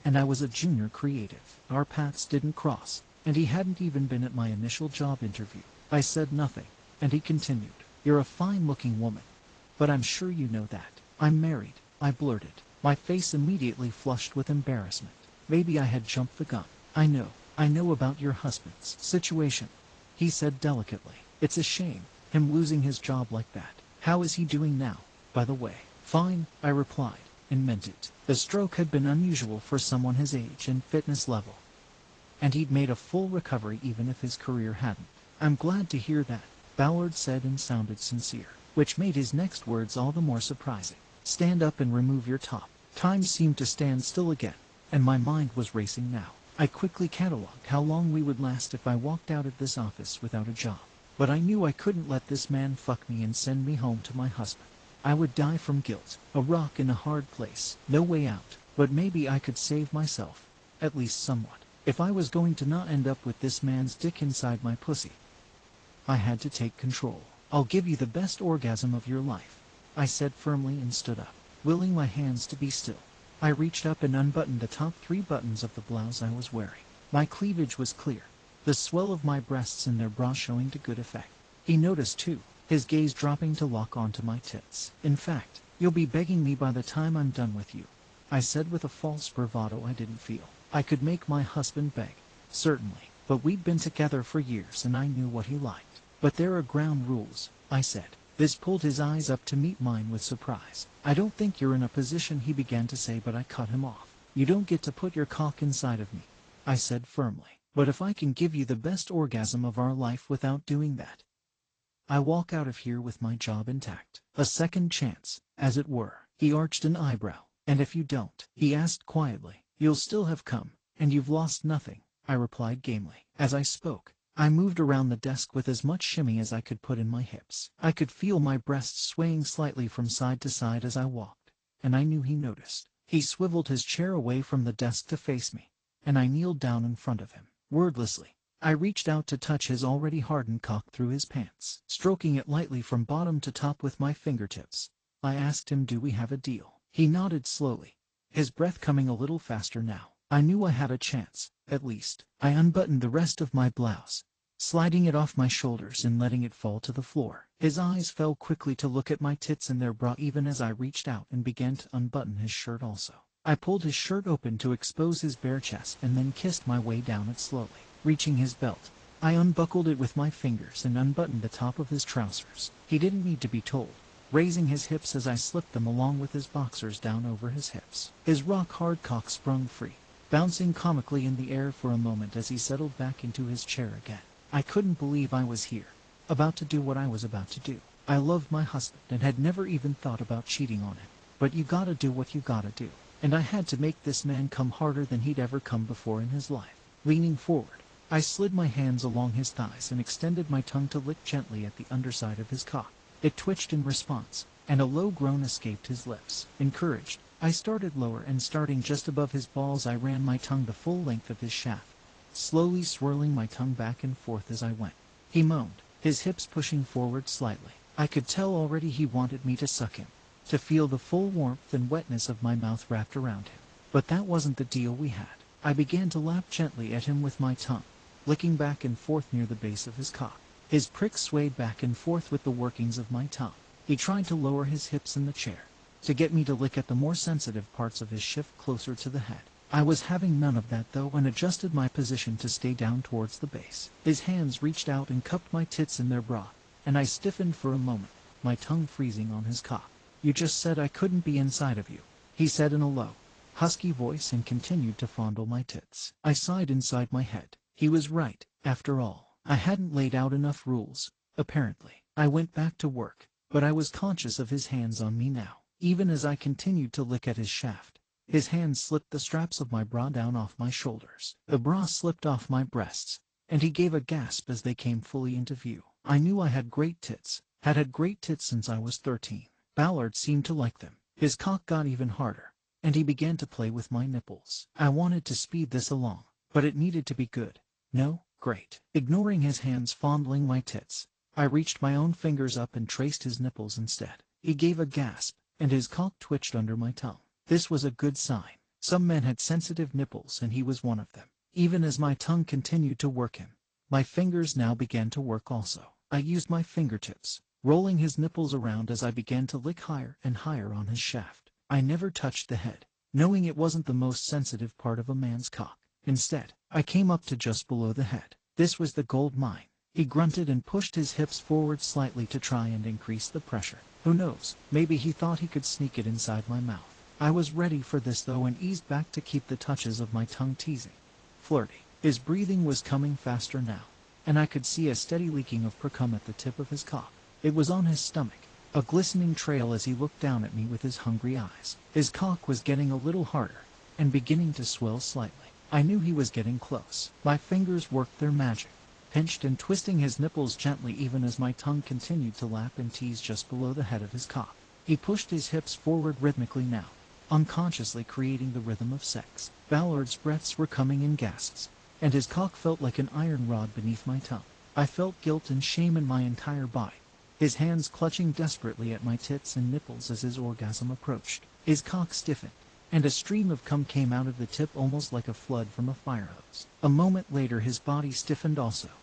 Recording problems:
garbled, watery; slightly; nothing above 8 kHz
hiss; faint; until 1:47, from 2:45 to 4:15 and from 5:21 on; 25 dB below the speech

